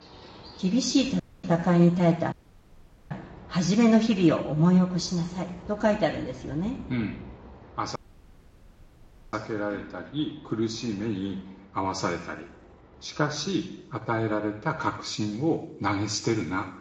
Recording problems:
room echo; slight; dies away in 0.7 s
off-mic speech; somewhat distant
garbled, watery; slightly
animal sounds; faint; throughout; 20 dB below the speech
audio cutting out; at 1 s, at 2.5 s for 1 s and at 8 s for 1.5 s

